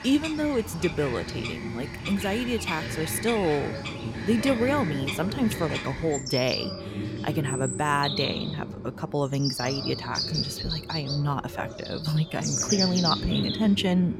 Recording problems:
animal sounds; loud; throughout; 4 dB below the speech
voice in the background; loud; throughout; 9 dB below the speech

